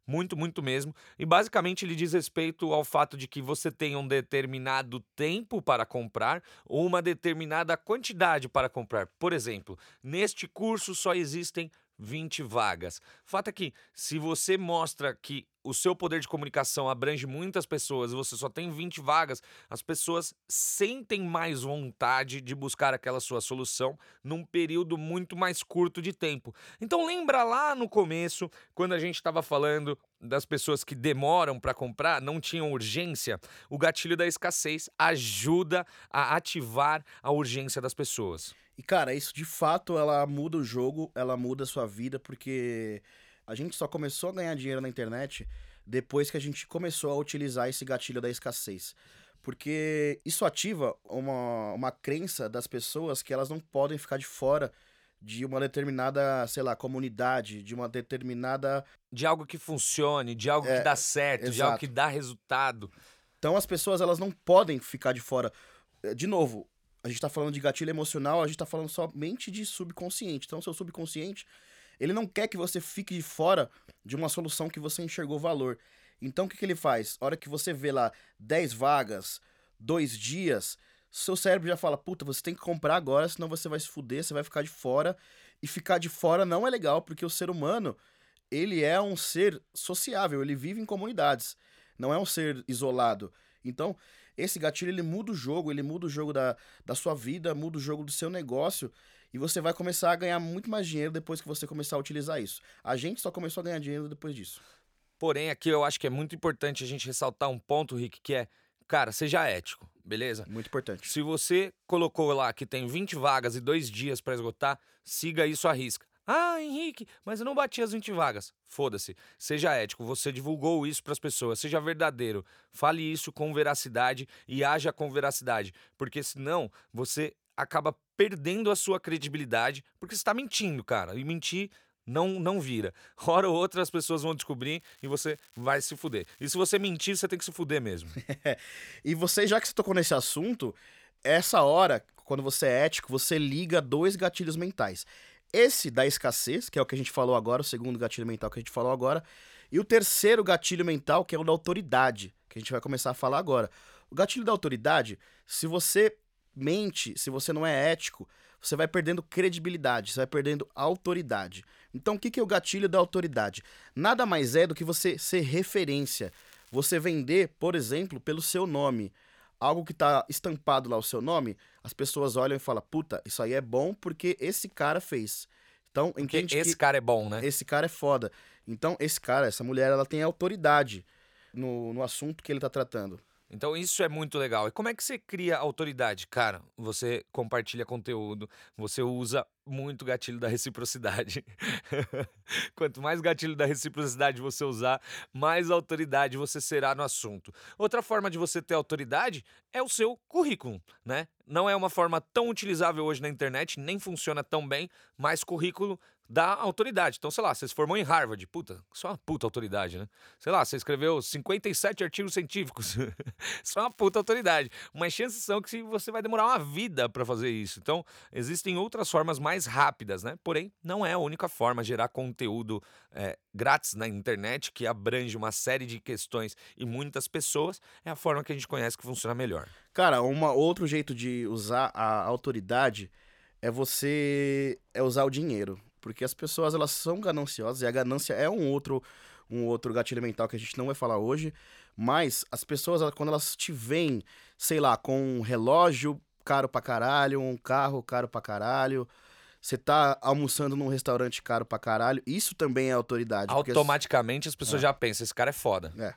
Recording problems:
crackling; faint; from 2:15 to 2:17, from 2:46 to 2:47 and at 3:34; 30 dB below the speech

